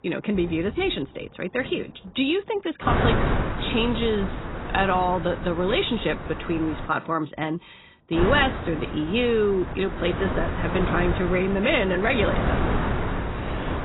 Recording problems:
garbled, watery; badly; nothing above 4 kHz
wind noise on the microphone; heavy; from 3 to 7 s and from 8 s on; 6 dB below the speech
rain or running water; faint; throughout; 25 dB below the speech

